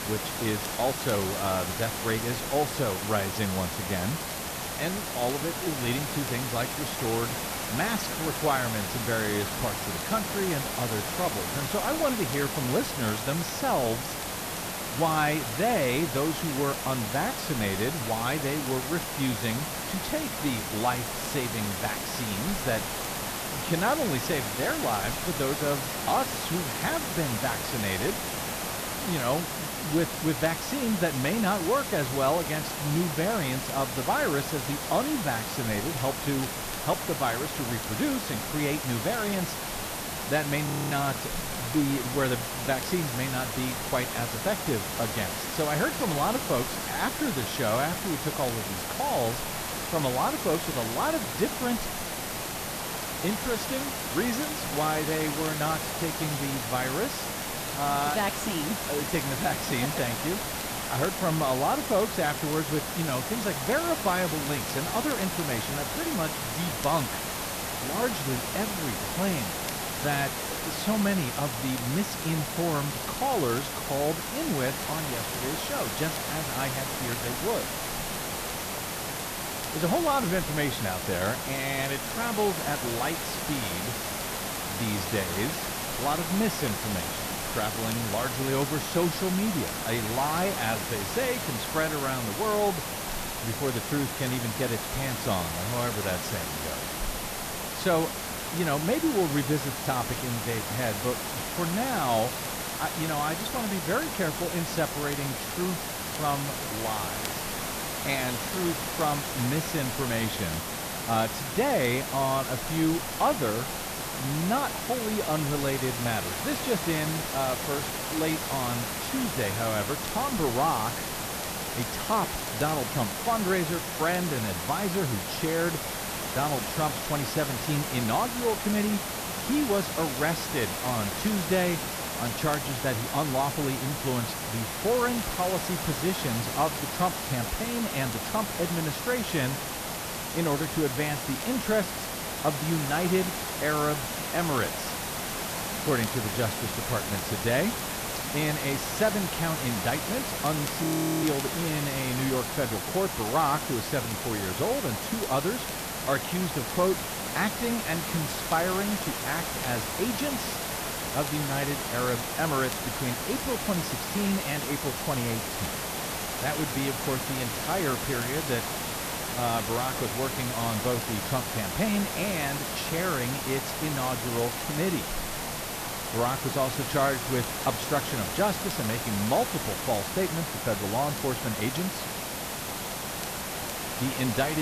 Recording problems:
distortion; slight; 10 dB below the speech
hiss; loud; throughout; 3 dB below the speech
crackle, like an old record; faint; 20 dB below the speech
audio freezing; at 41 s and at 2:31
abrupt cut into speech; at the end

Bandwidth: 14.5 kHz